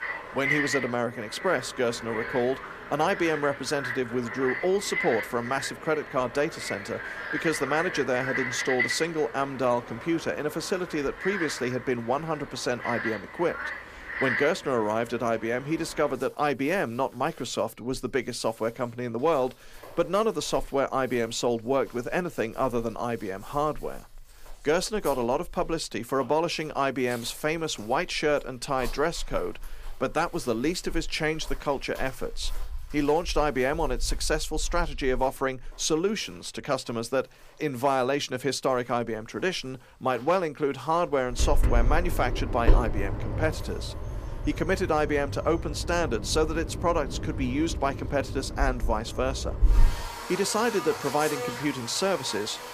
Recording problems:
animal sounds; loud; throughout; 5 dB below the speech

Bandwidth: 15 kHz